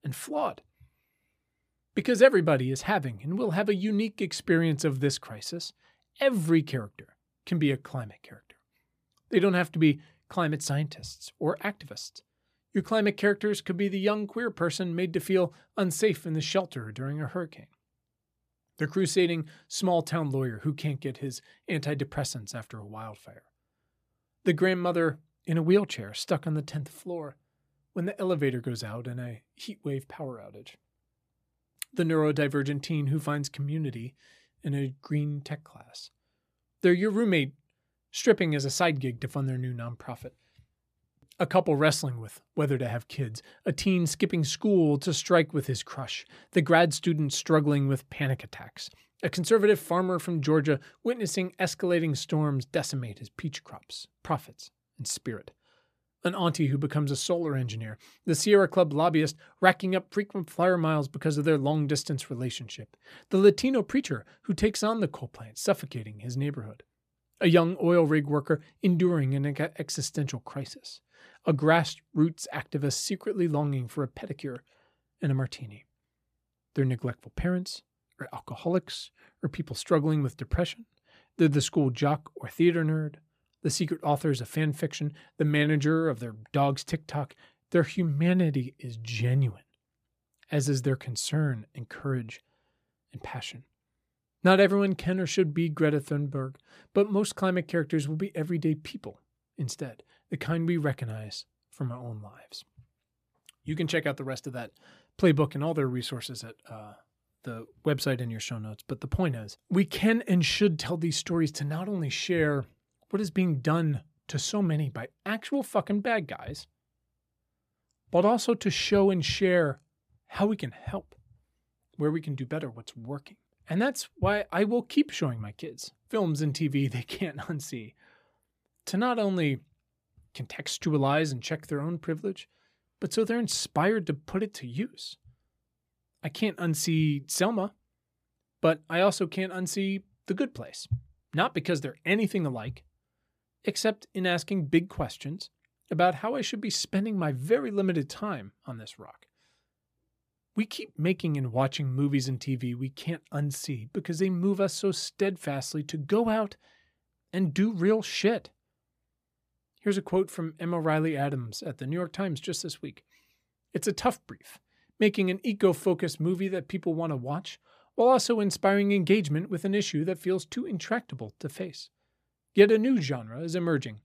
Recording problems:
none

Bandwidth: 15 kHz